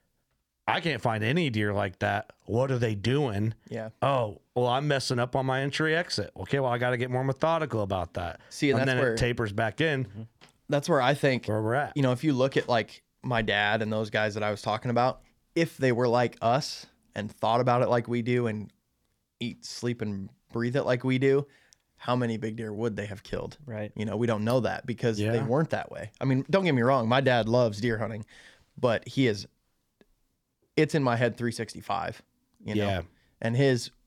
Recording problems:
none

